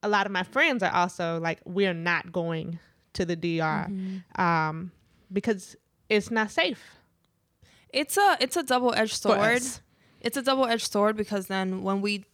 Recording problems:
none

